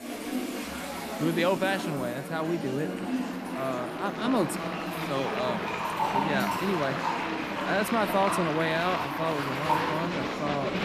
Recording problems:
household noises; loud; throughout; 5 dB below the speech
murmuring crowd; loud; throughout; 3 dB below the speech

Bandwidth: 14.5 kHz